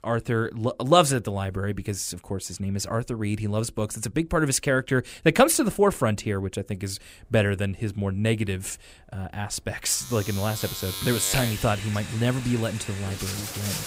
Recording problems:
household noises; loud; from 7 s on; 7 dB below the speech

